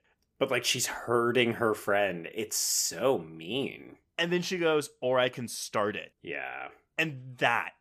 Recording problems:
none

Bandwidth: 14.5 kHz